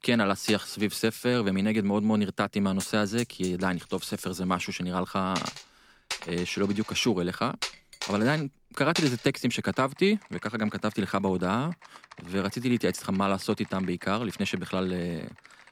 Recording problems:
household noises; noticeable; throughout; 10 dB below the speech

